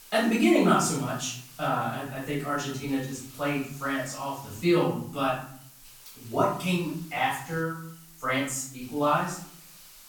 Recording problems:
off-mic speech; far
room echo; noticeable; dies away in 0.6 s
hiss; faint; throughout; 20 dB below the speech

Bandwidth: 18 kHz